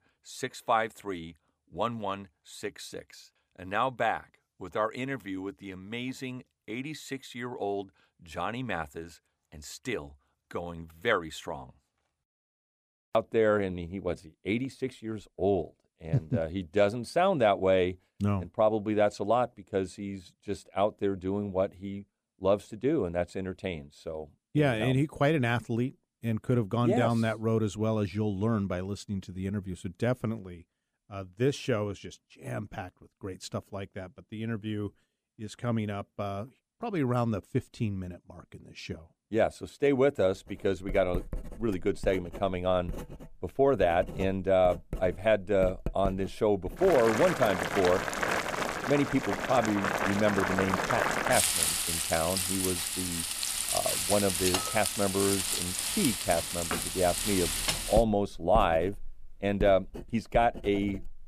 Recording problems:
household noises; loud; from 41 s on; 1 dB below the speech

